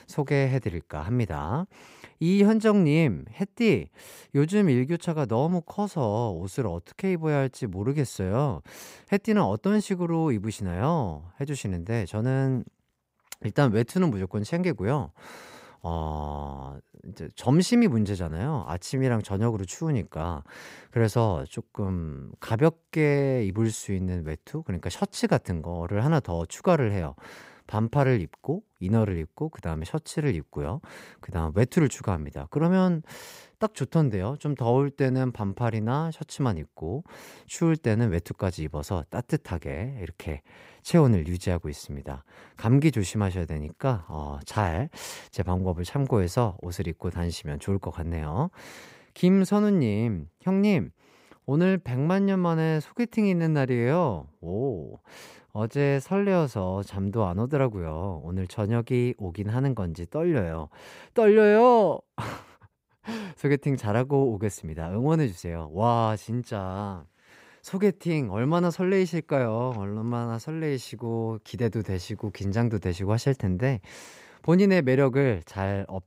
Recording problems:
none

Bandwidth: 15.5 kHz